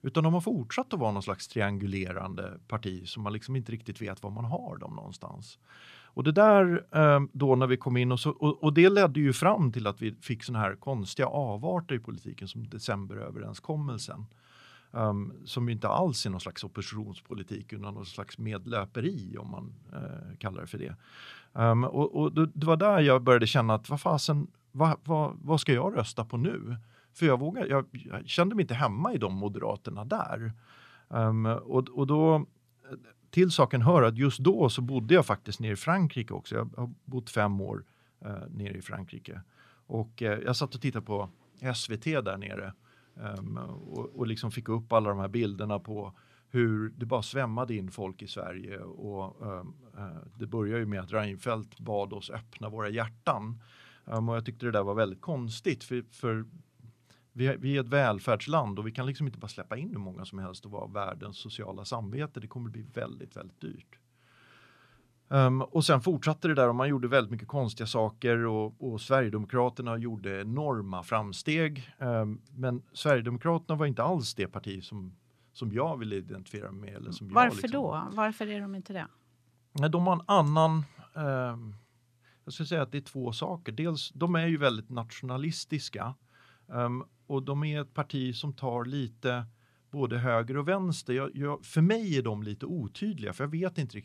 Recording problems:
none

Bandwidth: 14.5 kHz